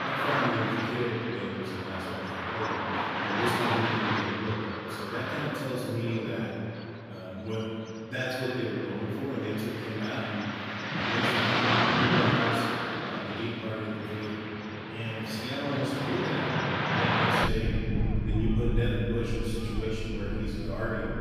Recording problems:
room echo; strong; dies away in 2.5 s
off-mic speech; far
traffic noise; very loud; throughout; 3 dB above the speech

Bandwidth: 15 kHz